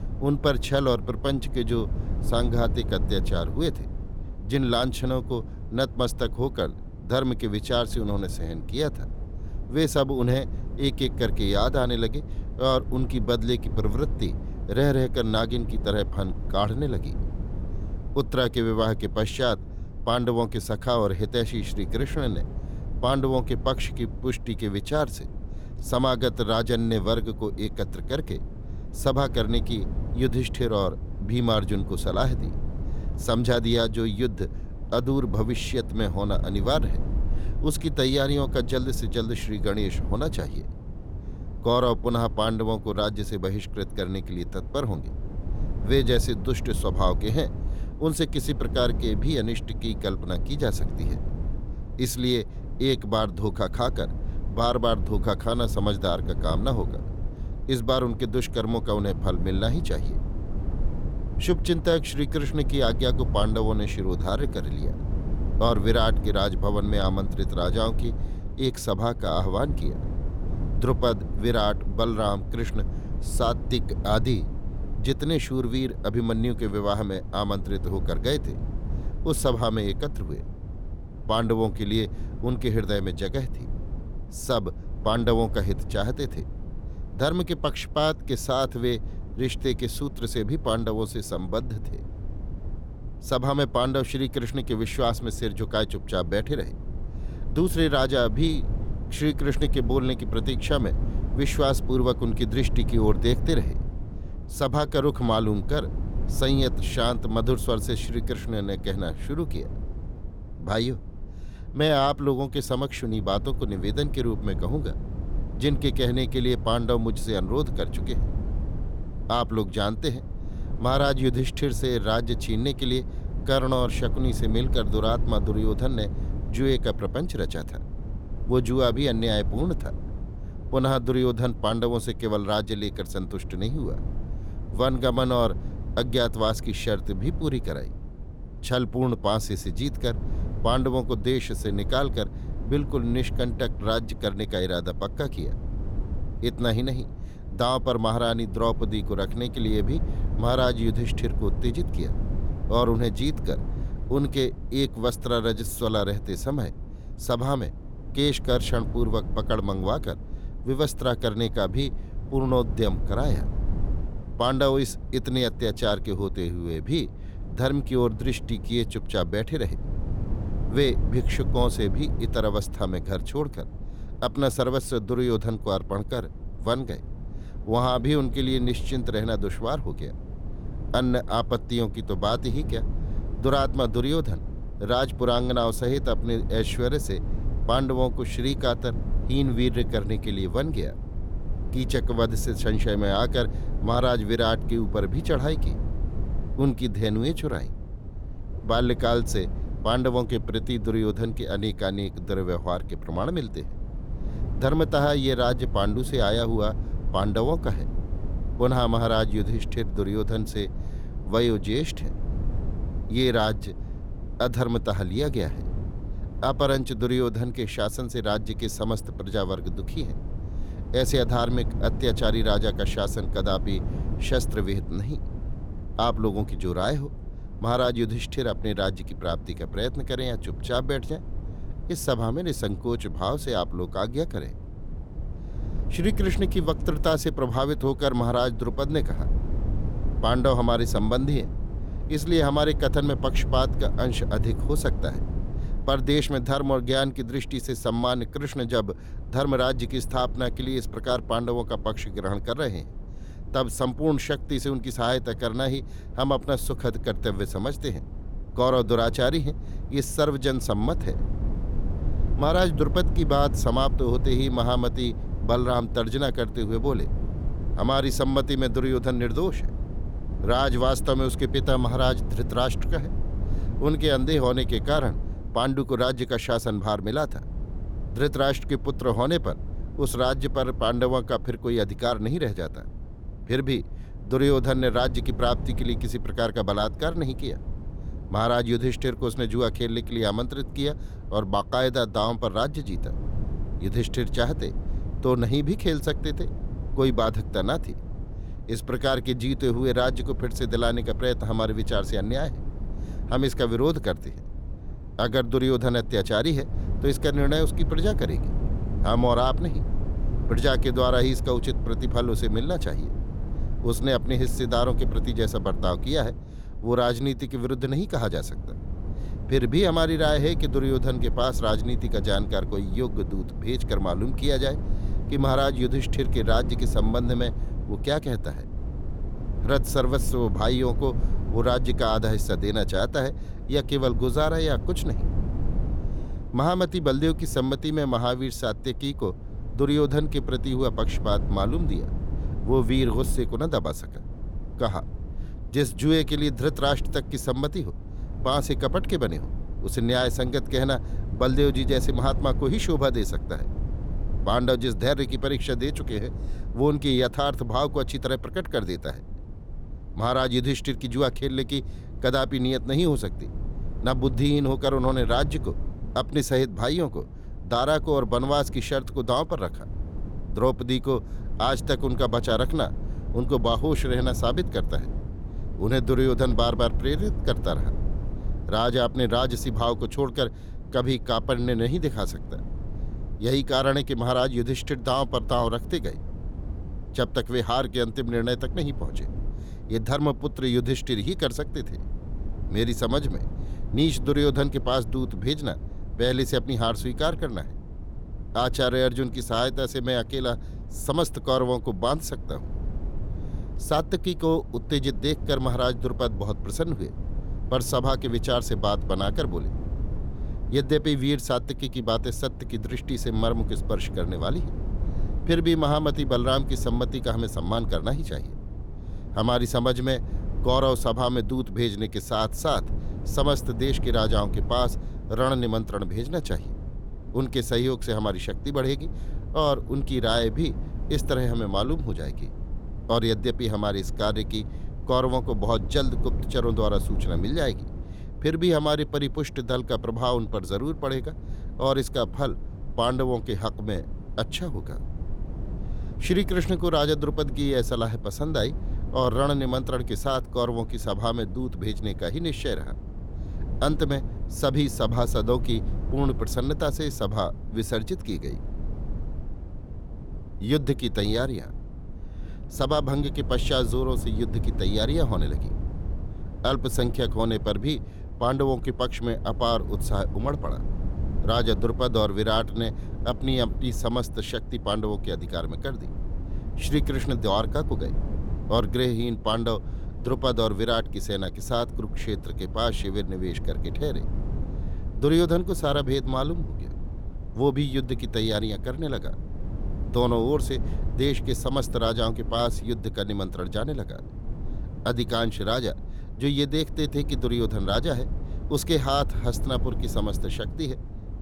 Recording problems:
low rumble; noticeable; throughout; 20 dB below the speech

